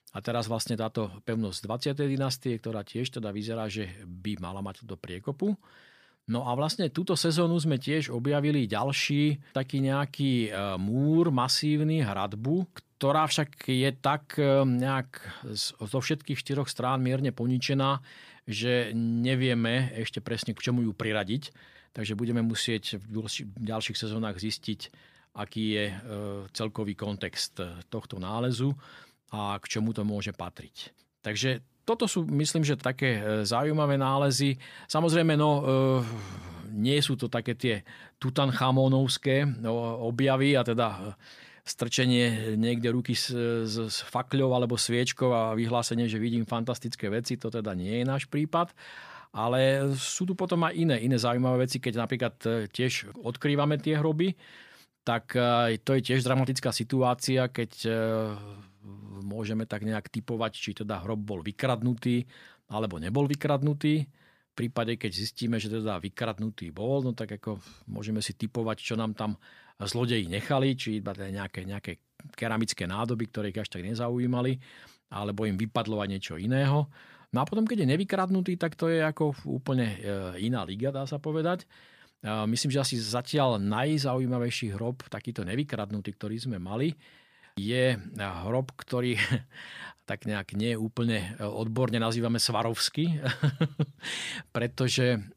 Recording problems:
none

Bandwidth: 15 kHz